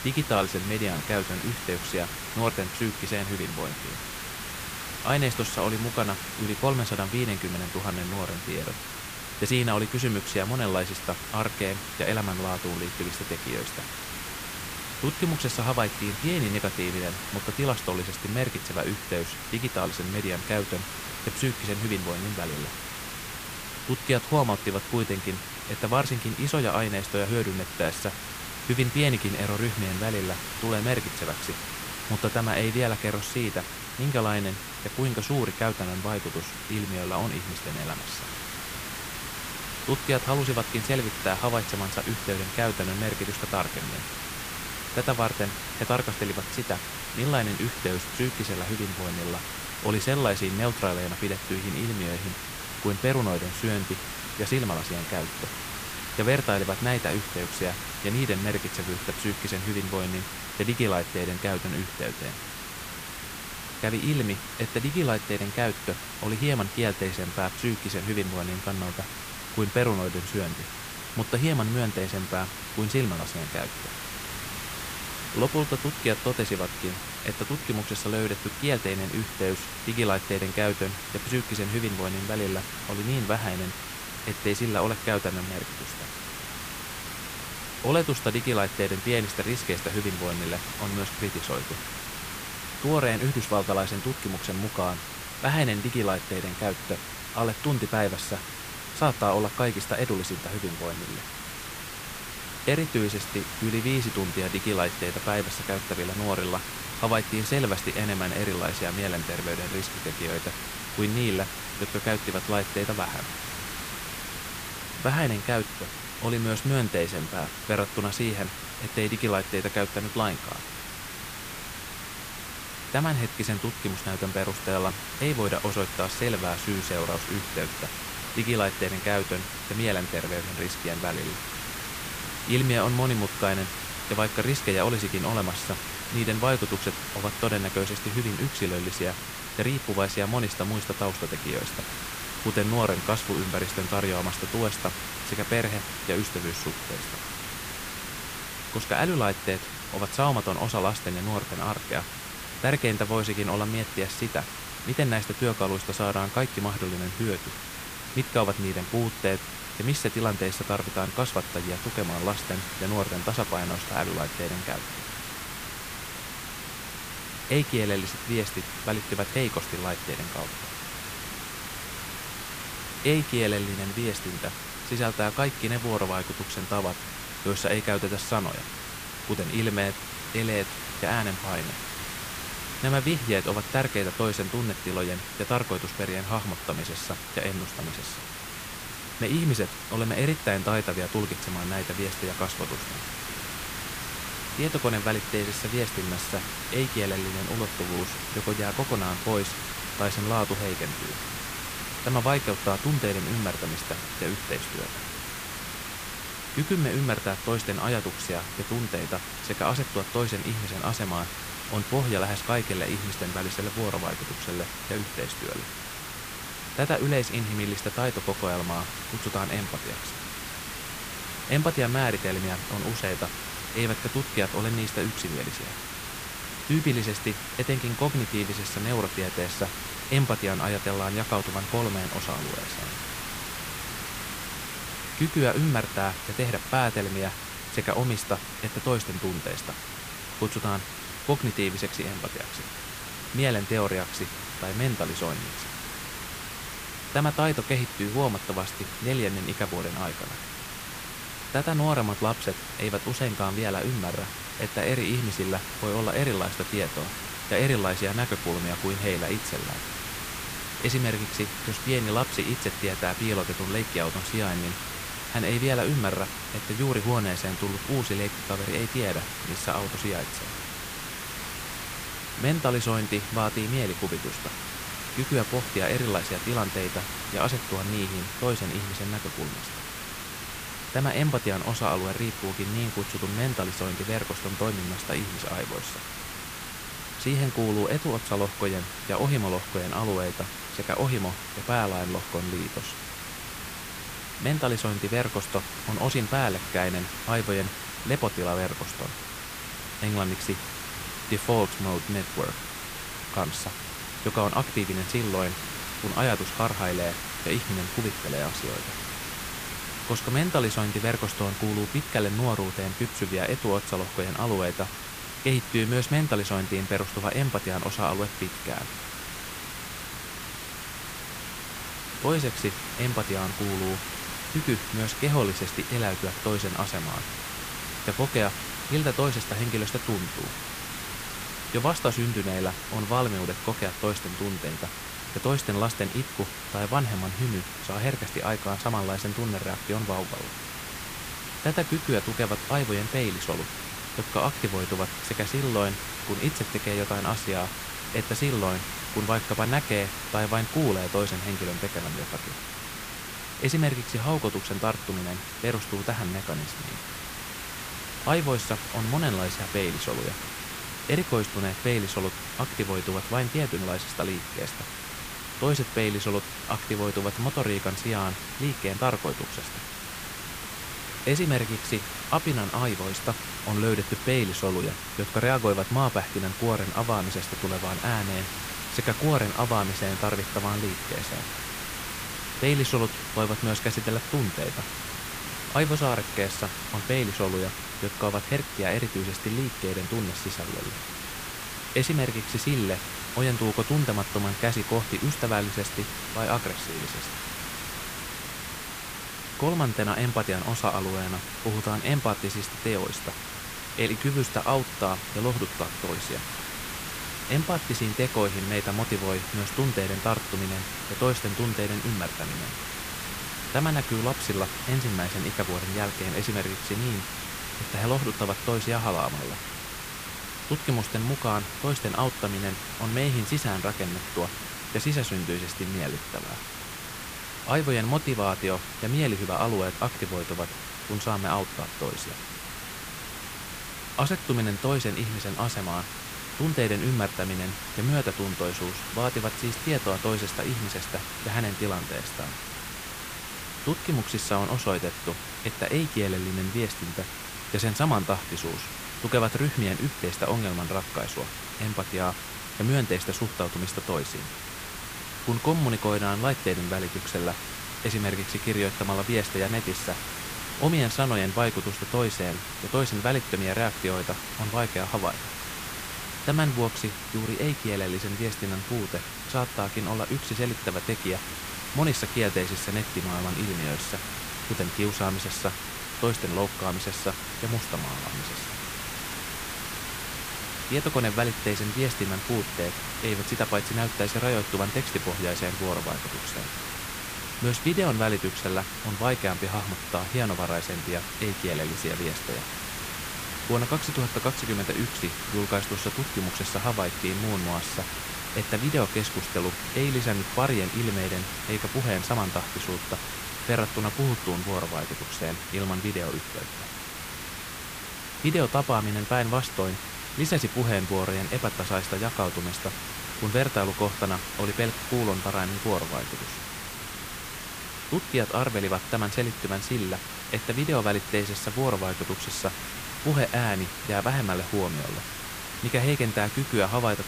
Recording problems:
hiss; loud; throughout; 5 dB below the speech

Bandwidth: 15 kHz